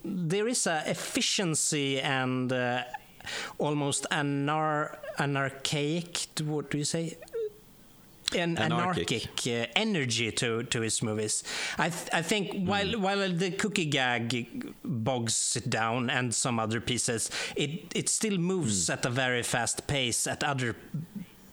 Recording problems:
squashed, flat; heavily

